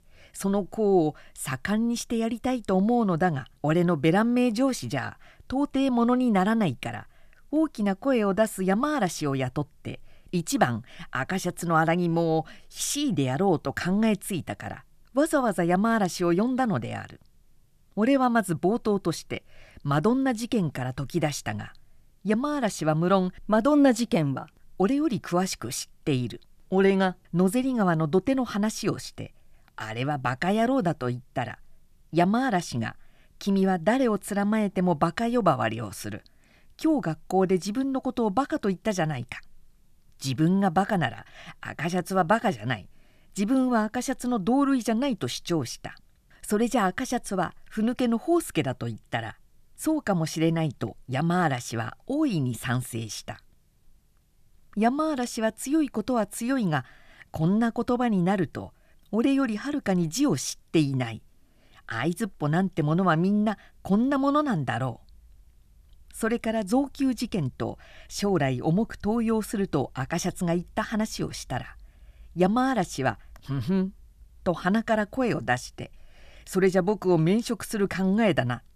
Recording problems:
none

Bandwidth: 14.5 kHz